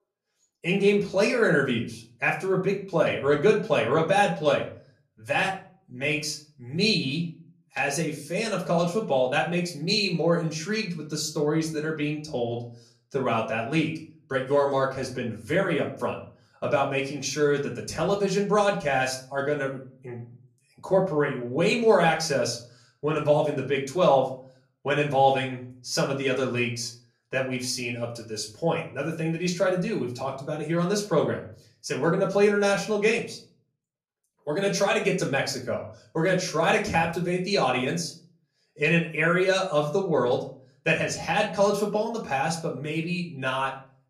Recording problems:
off-mic speech; far
room echo; slight; dies away in 0.4 s

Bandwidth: 14.5 kHz